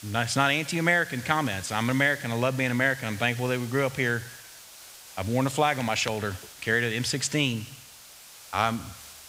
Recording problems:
hiss; noticeable; throughout; 15 dB below the speech

